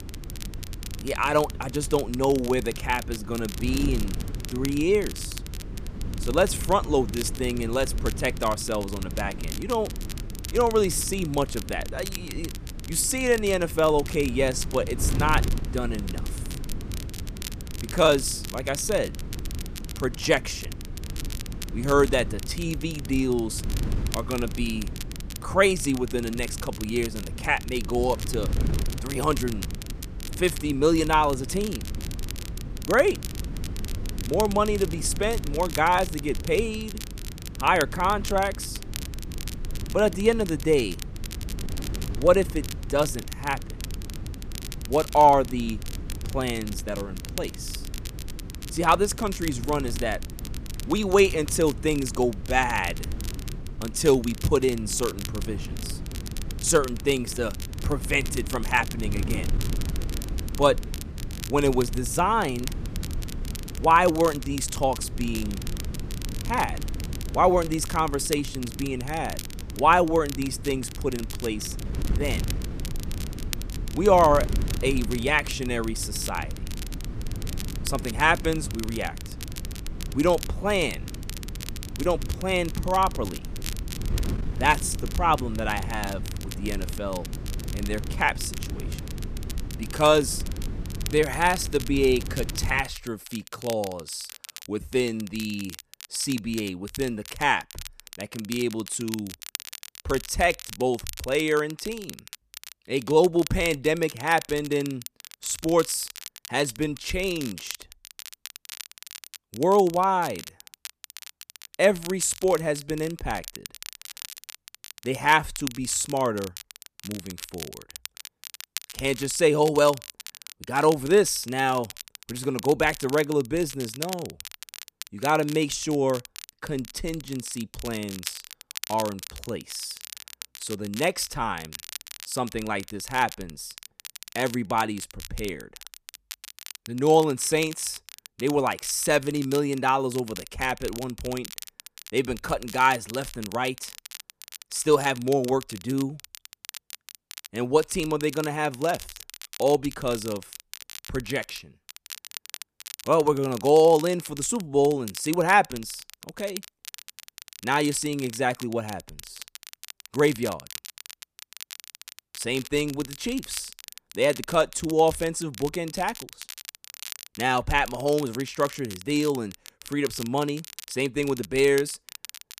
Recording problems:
wind noise on the microphone; occasional gusts; until 1:33; 20 dB below the speech
crackle, like an old record; noticeable; 15 dB below the speech

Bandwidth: 14.5 kHz